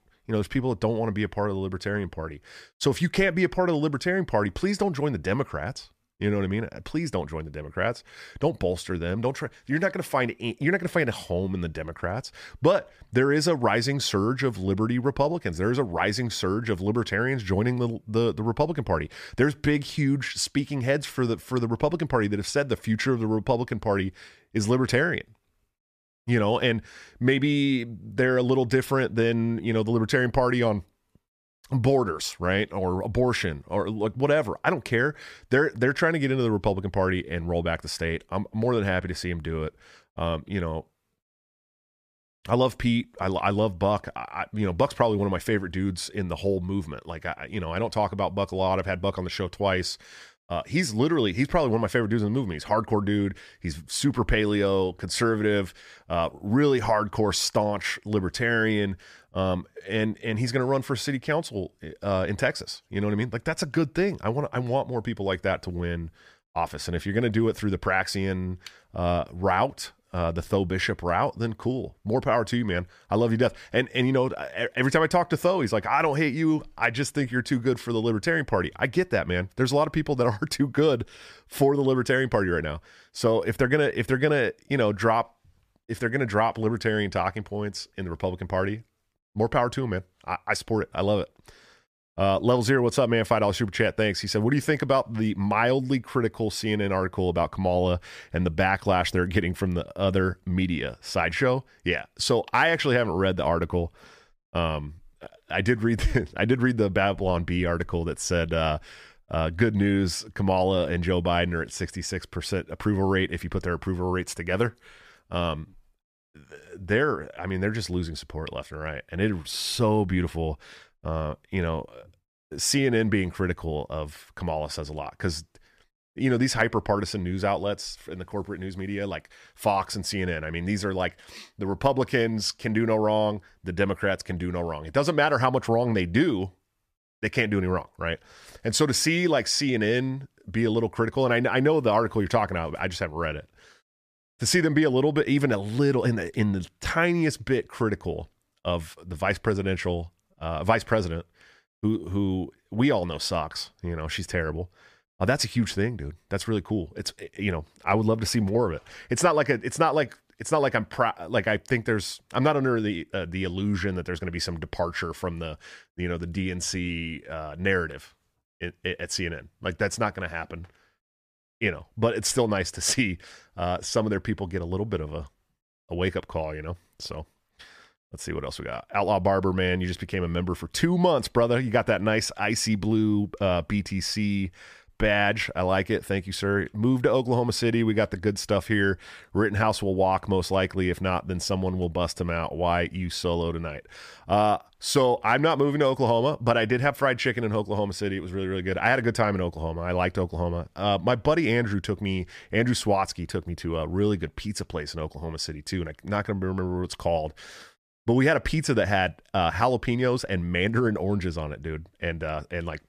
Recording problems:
none

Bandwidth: 14.5 kHz